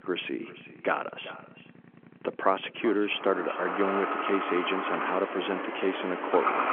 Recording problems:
echo of what is said; noticeable; throughout; 380 ms later, 15 dB below the speech
phone-call audio; nothing above 3.5 kHz
traffic noise; loud; throughout; 2 dB below the speech

